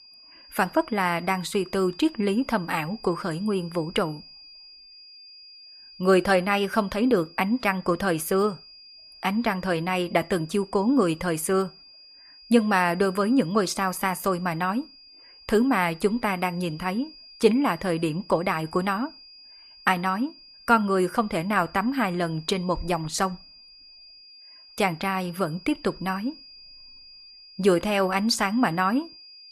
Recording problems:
high-pitched whine; faint; throughout; 5 kHz, 20 dB below the speech

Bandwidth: 14.5 kHz